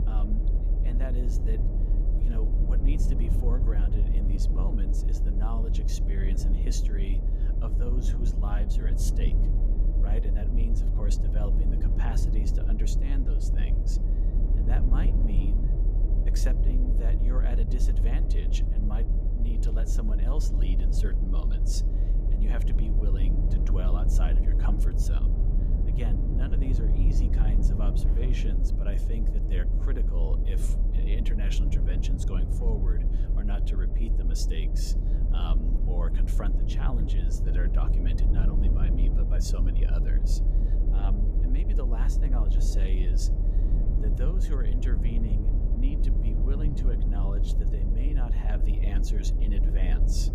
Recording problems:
low rumble; loud; throughout; 1 dB below the speech

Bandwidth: 15 kHz